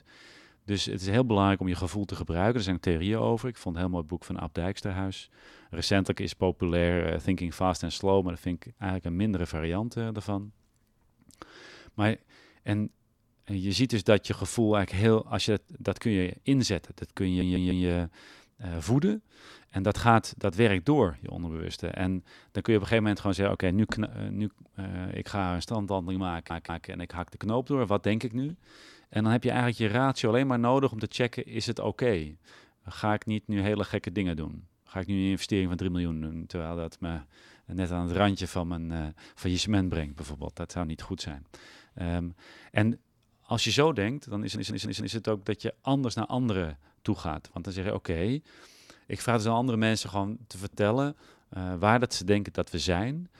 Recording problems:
audio stuttering; at 17 s, at 26 s and at 44 s

